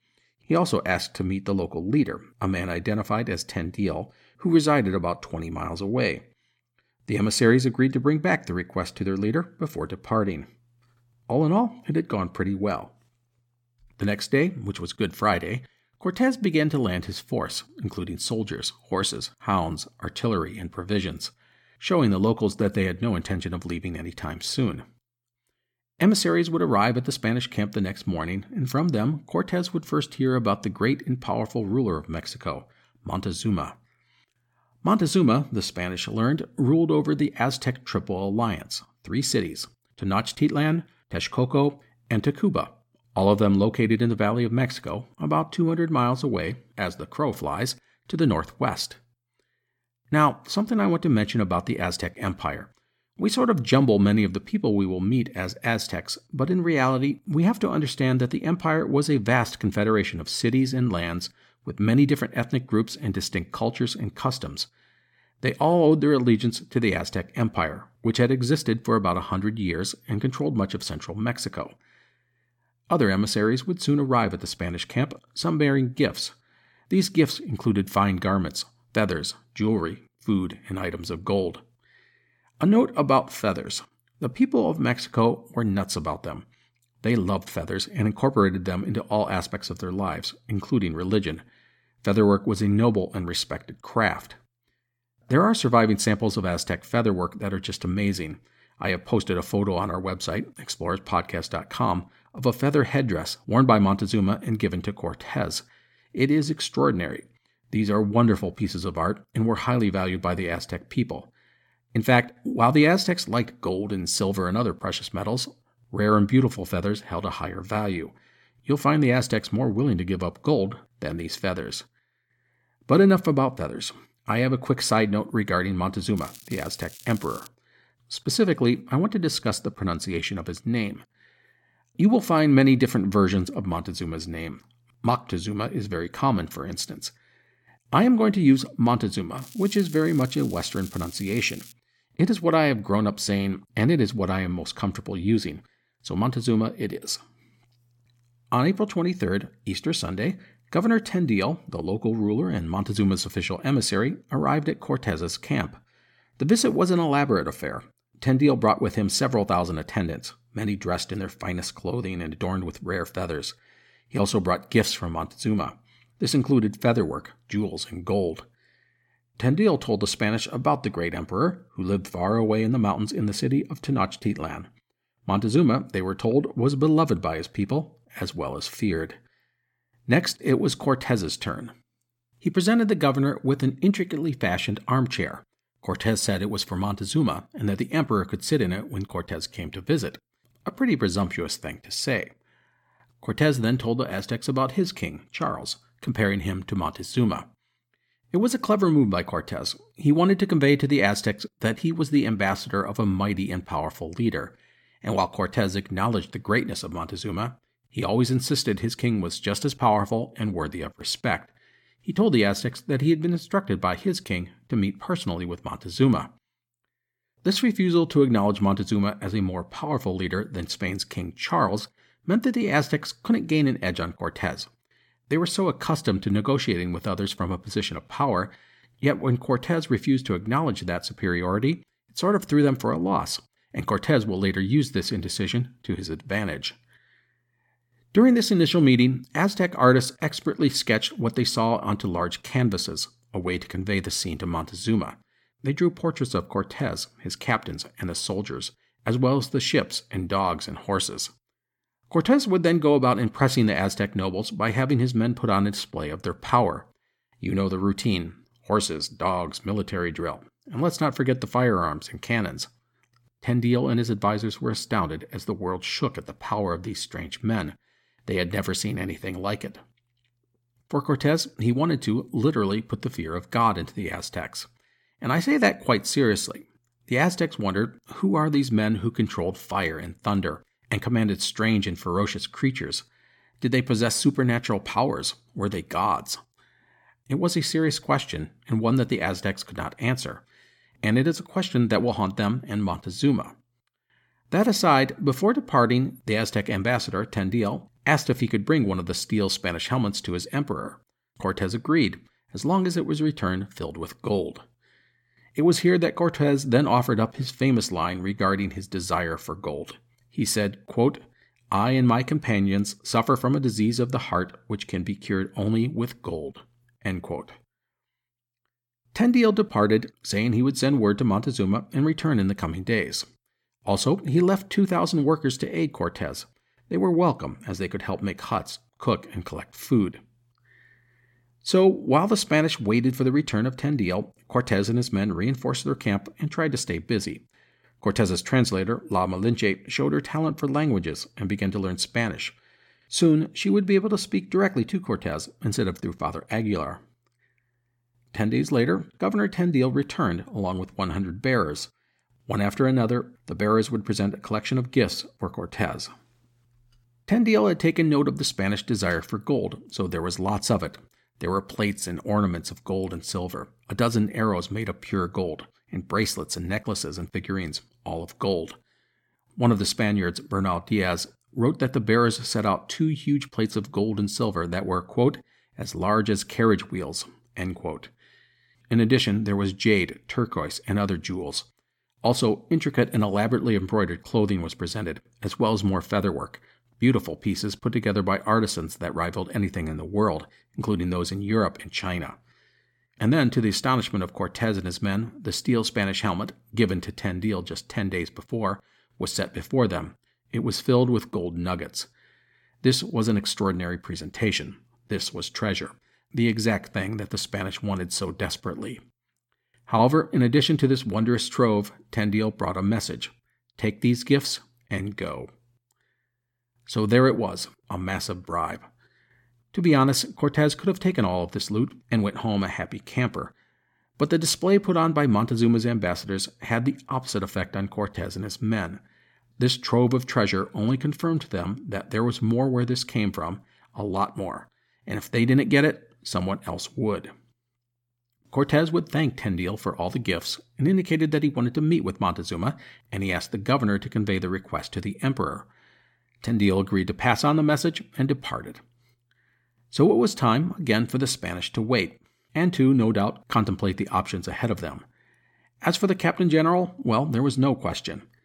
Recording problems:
crackling; noticeable; from 2:06 to 2:07 and from 2:19 to 2:22; 20 dB below the speech

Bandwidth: 17 kHz